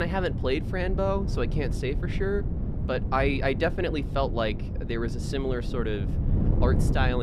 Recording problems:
wind noise on the microphone; occasional gusts; 10 dB below the speech
abrupt cut into speech; at the start and the end

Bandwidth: 14 kHz